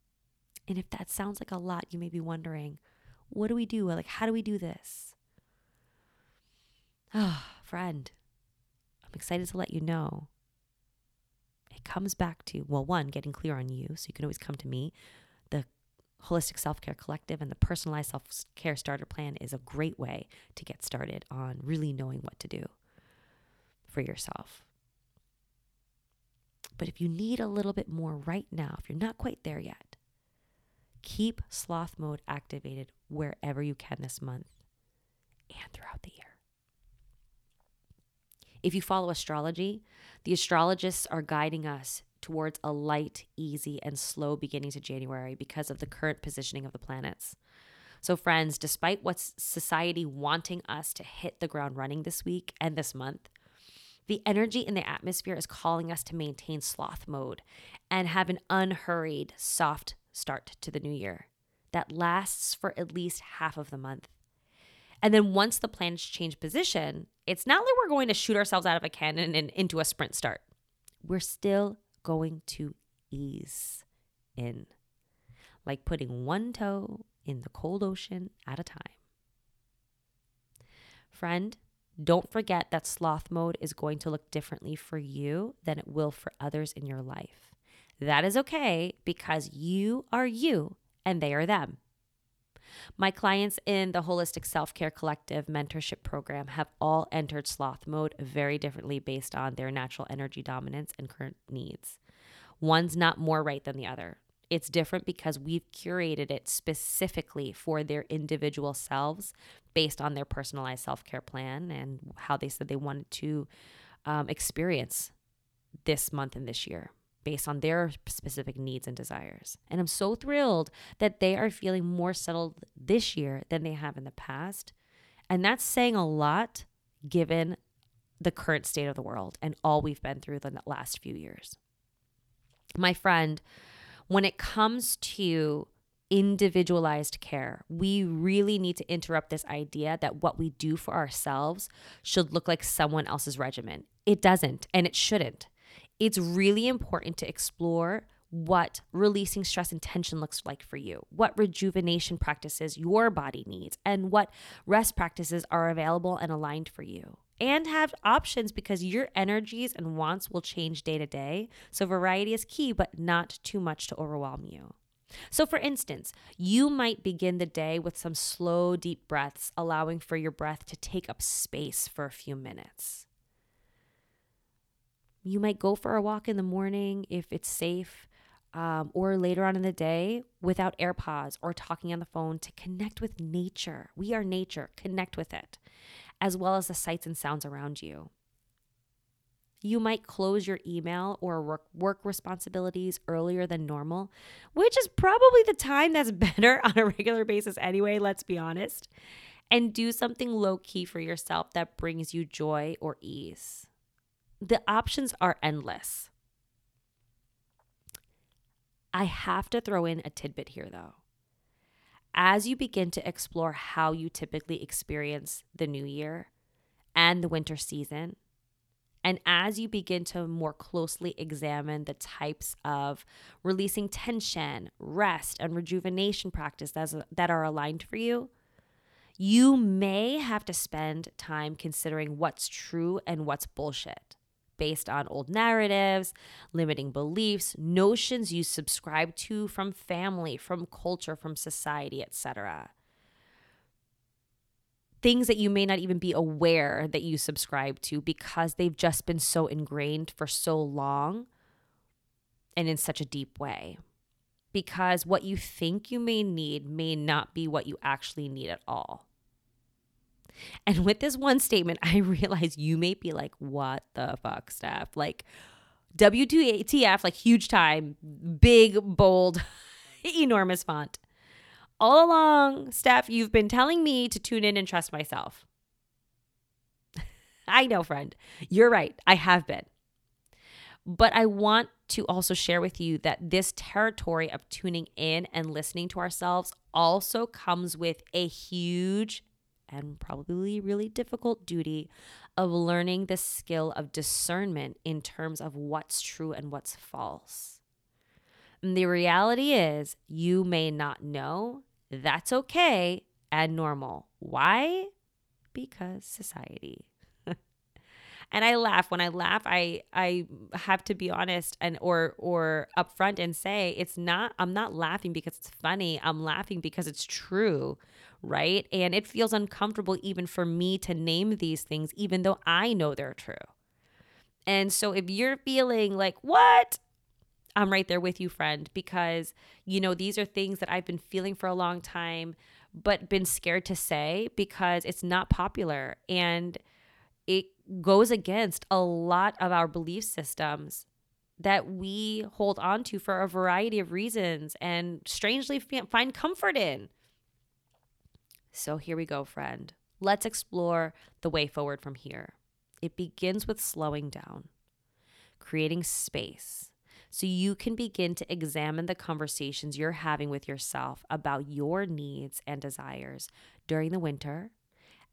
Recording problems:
none

